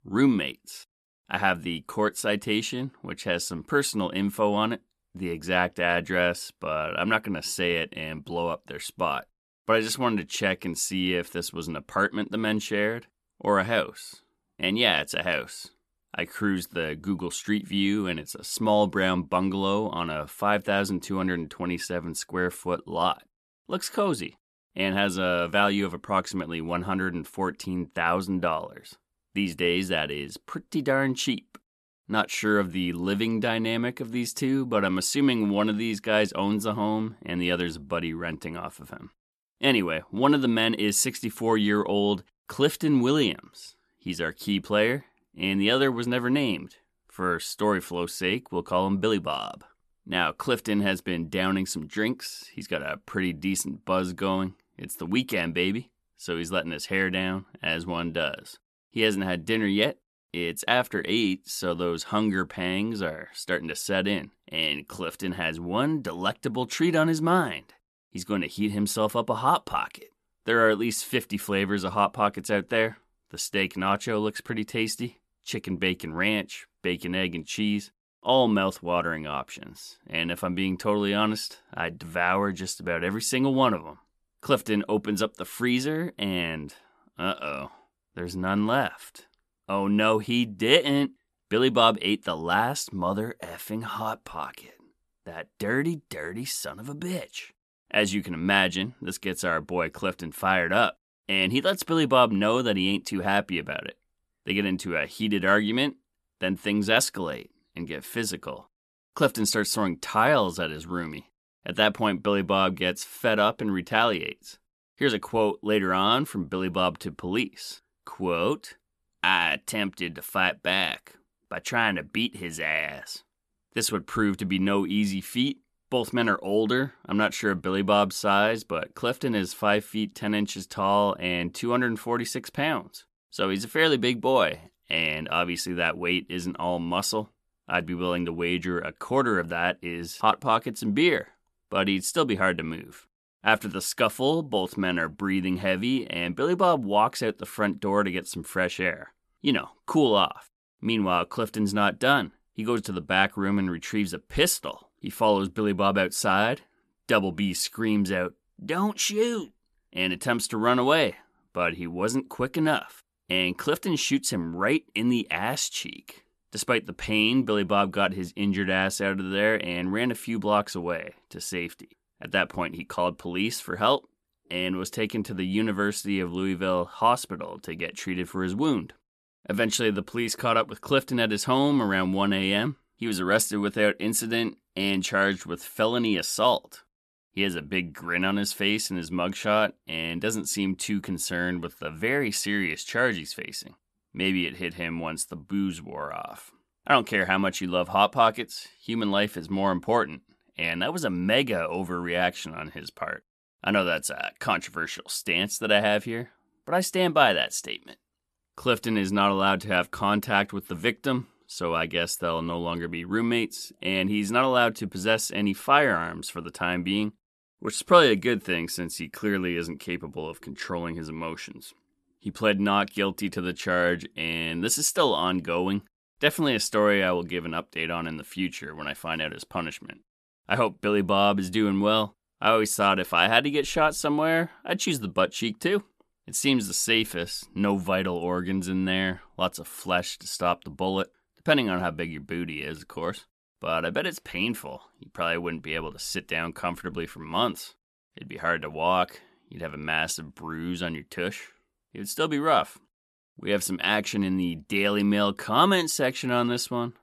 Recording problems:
none

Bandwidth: 13.5 kHz